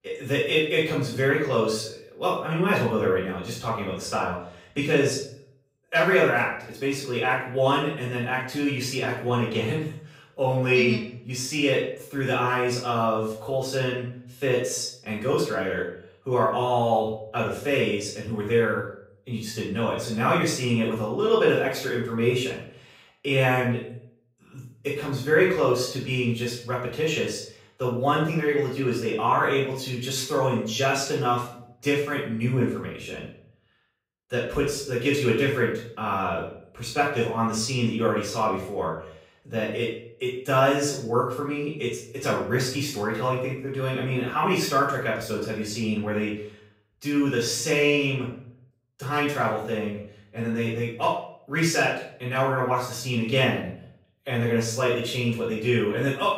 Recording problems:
off-mic speech; far
room echo; noticeable; dies away in 0.5 s

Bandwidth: 15.5 kHz